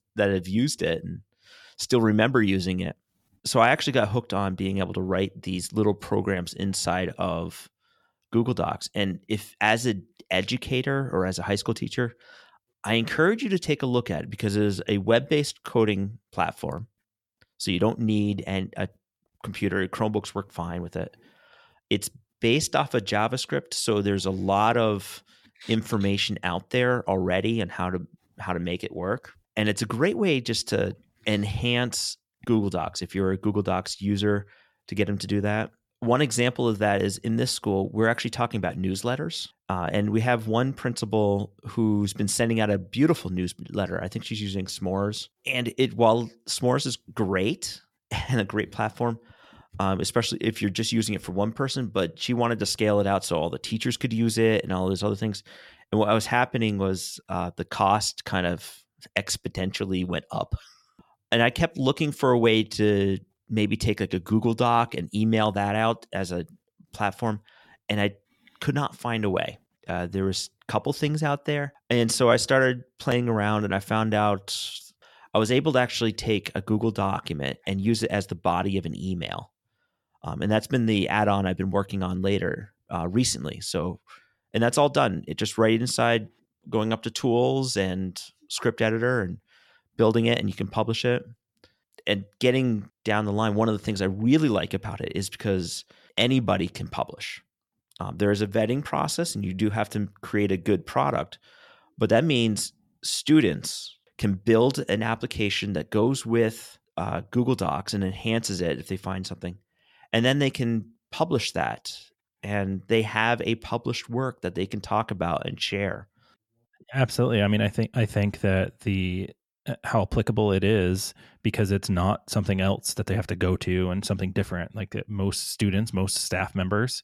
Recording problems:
none

